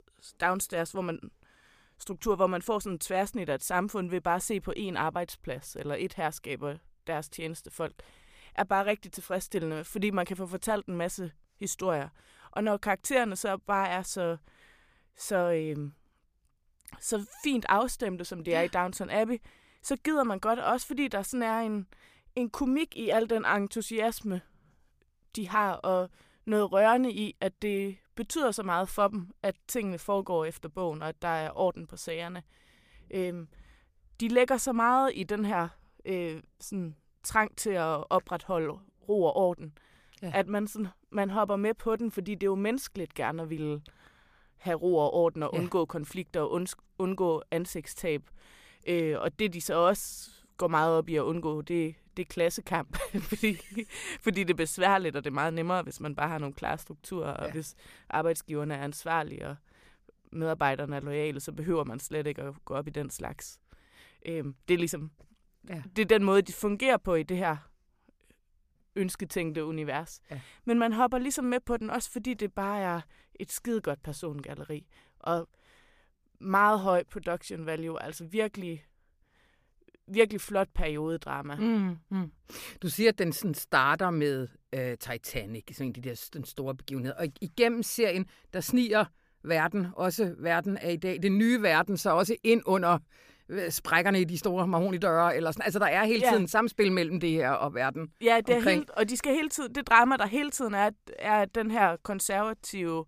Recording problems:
none

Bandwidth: 15 kHz